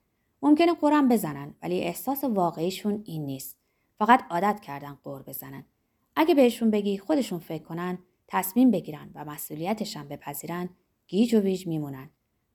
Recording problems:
none

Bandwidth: 18.5 kHz